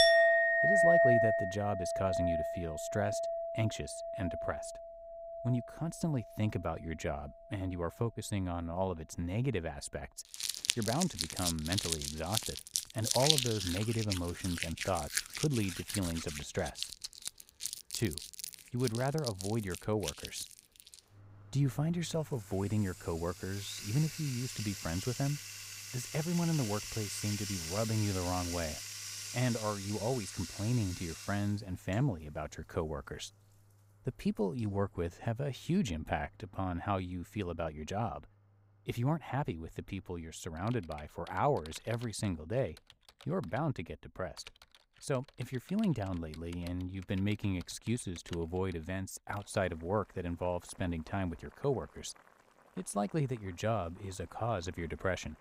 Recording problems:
household noises; very loud; throughout; 1 dB above the speech

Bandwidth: 15.5 kHz